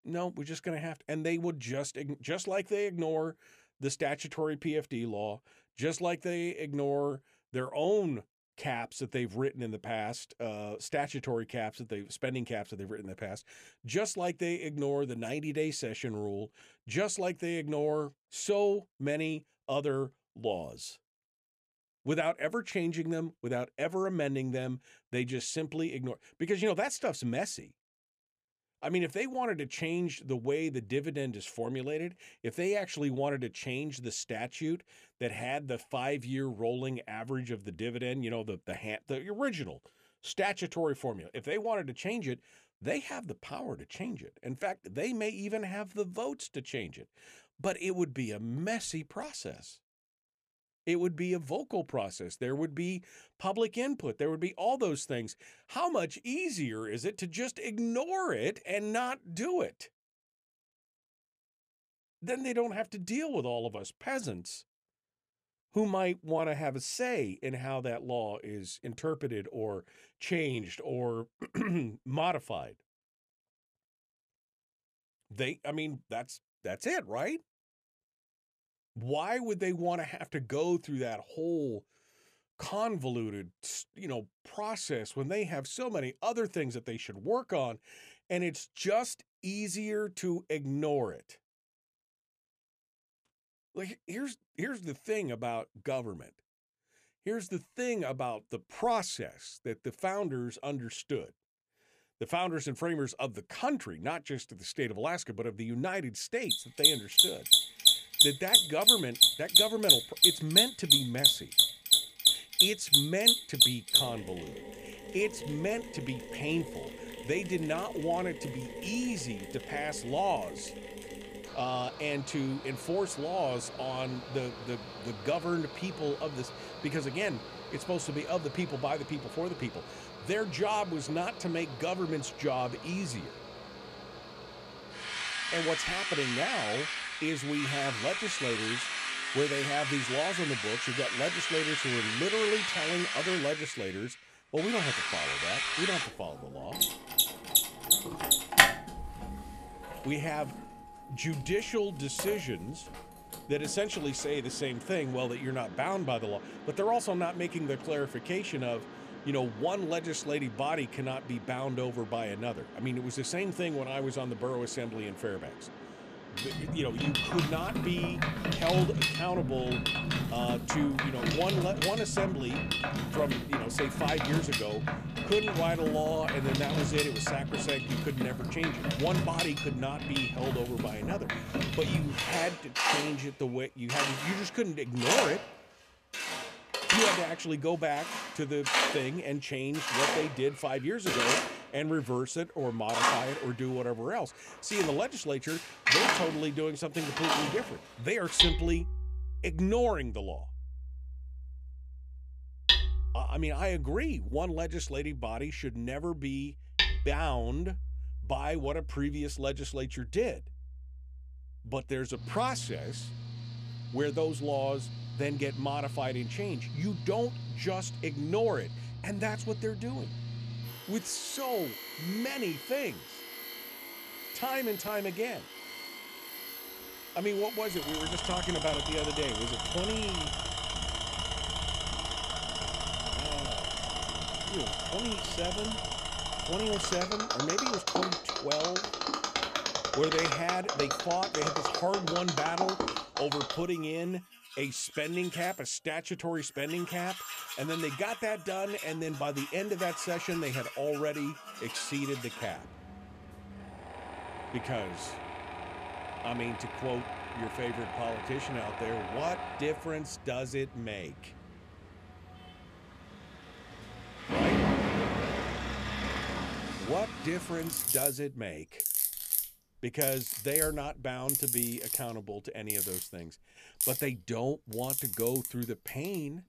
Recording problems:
machinery noise; very loud; from 1:47 on; 4 dB above the speech

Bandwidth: 14.5 kHz